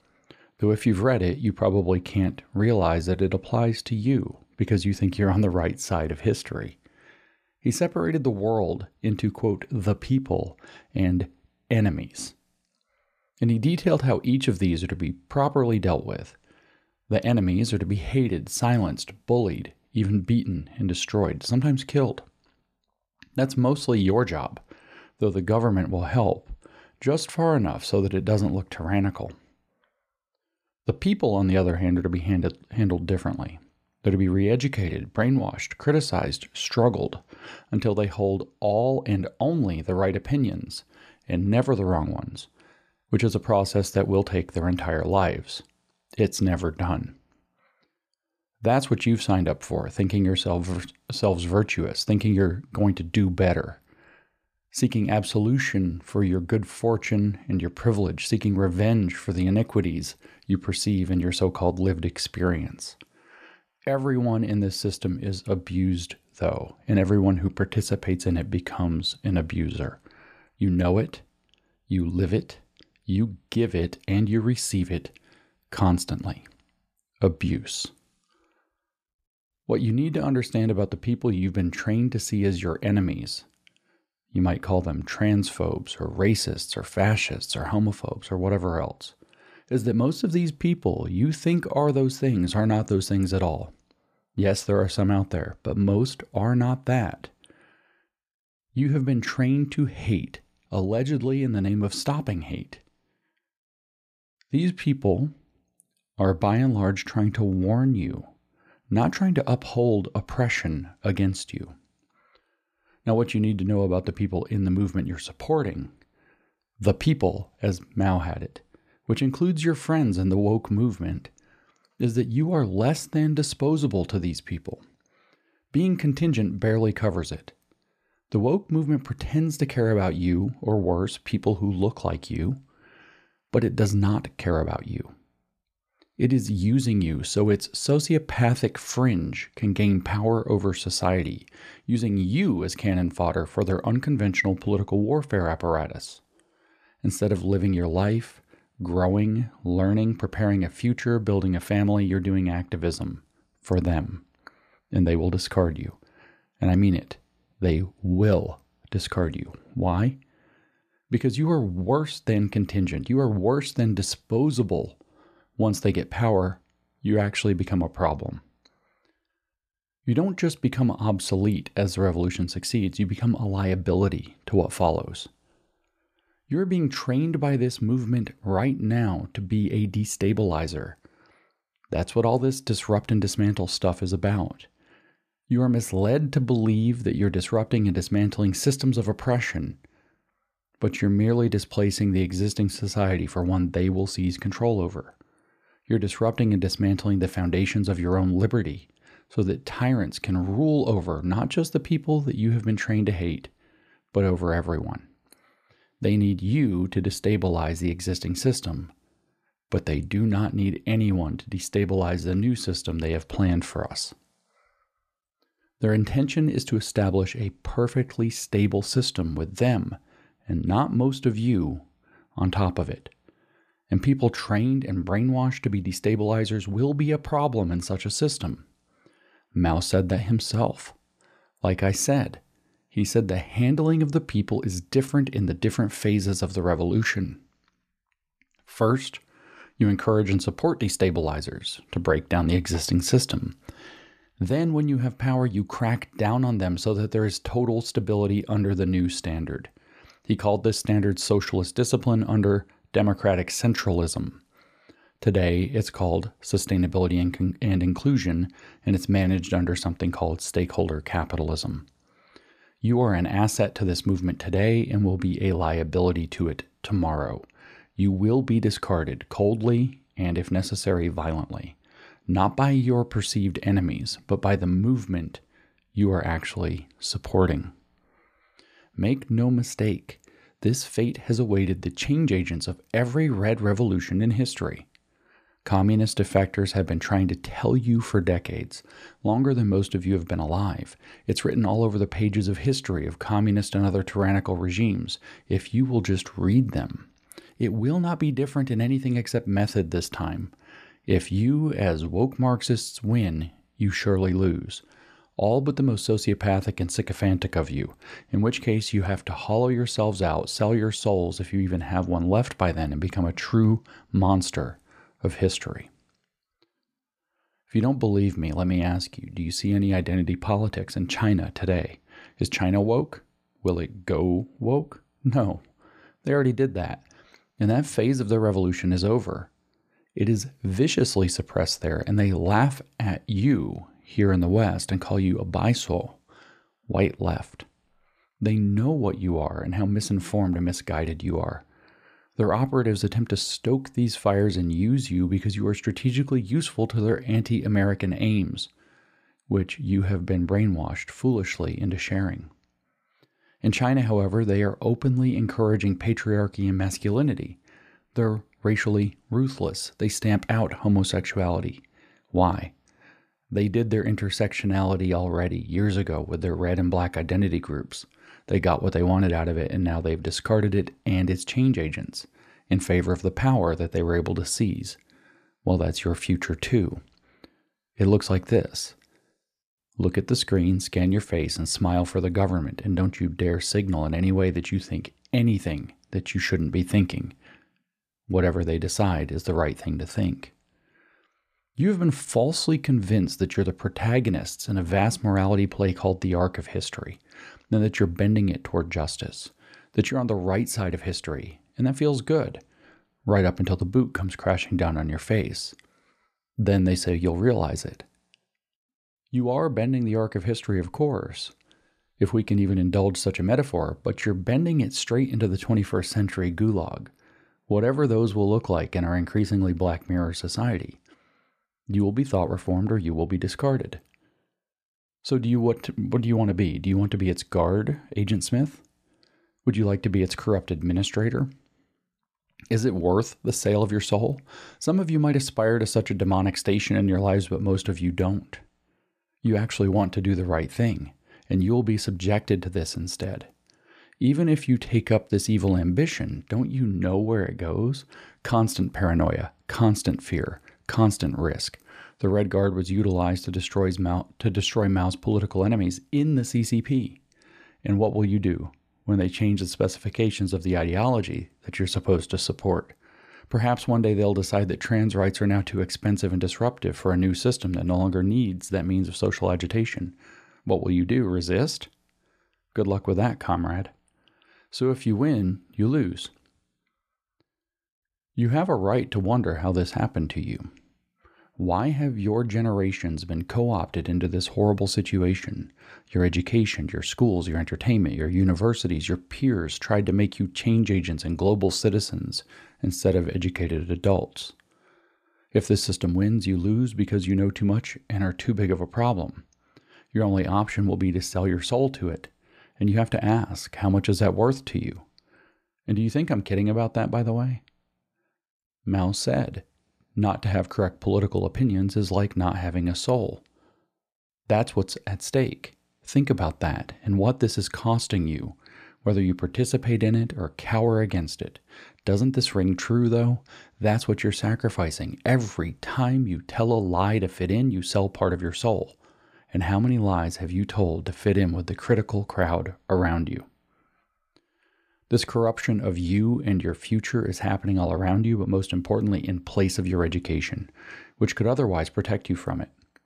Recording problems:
none

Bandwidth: 14.5 kHz